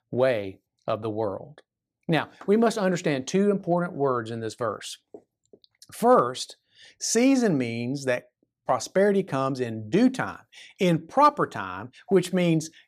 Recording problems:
none

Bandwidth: 14.5 kHz